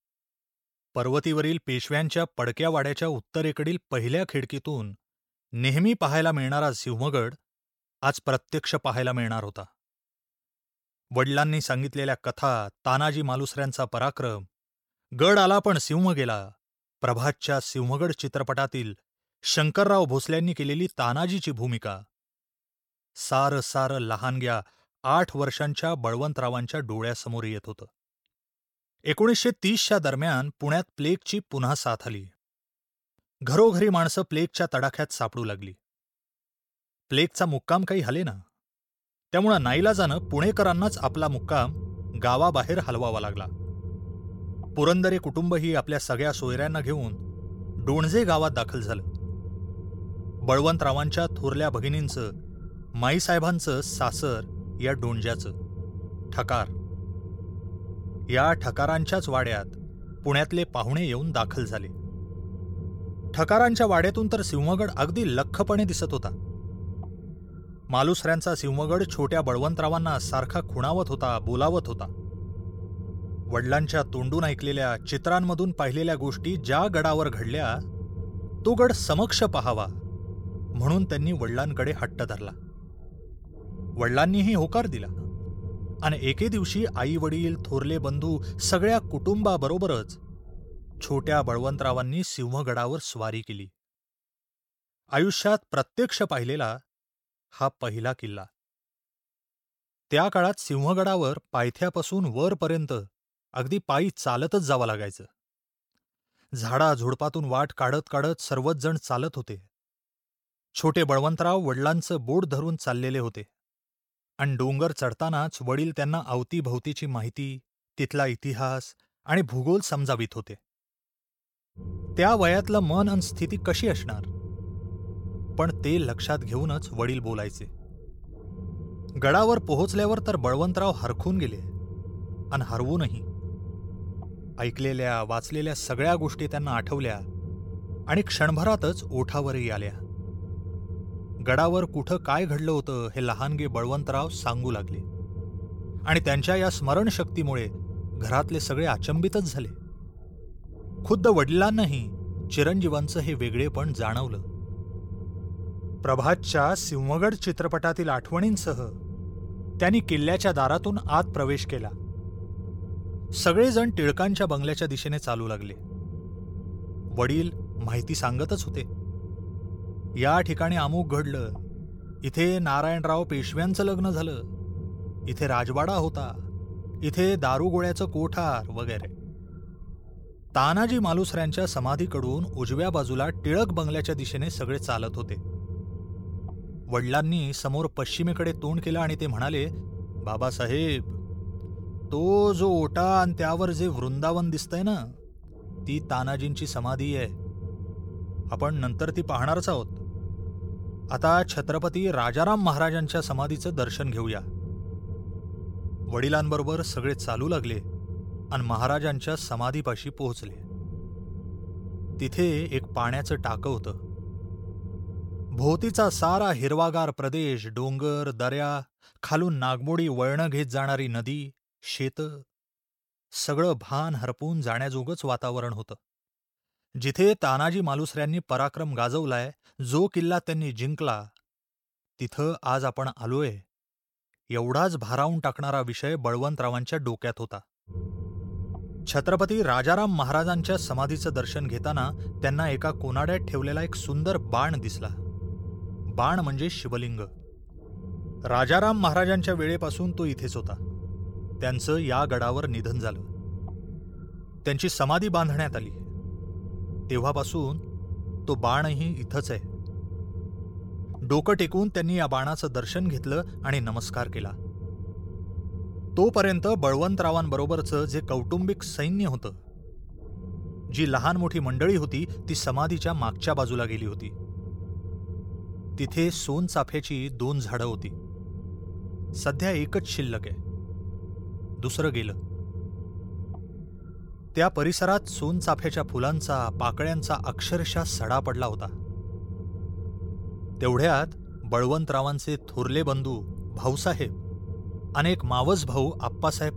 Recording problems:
low rumble; faint; from 40 s to 1:32, from 2:02 to 3:36 and from 3:58 on; 20 dB below the speech

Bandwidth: 17 kHz